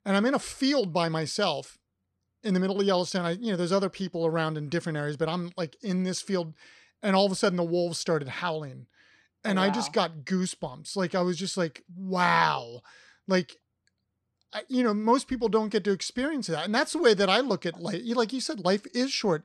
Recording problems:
none

